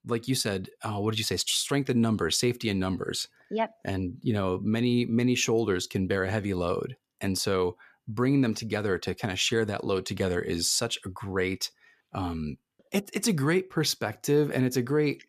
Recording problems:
none

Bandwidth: 14.5 kHz